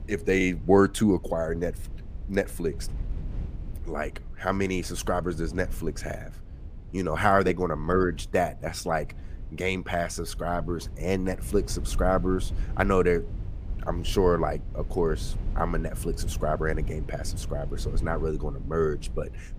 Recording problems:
low rumble; faint; throughout; 20 dB below the speech

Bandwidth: 15 kHz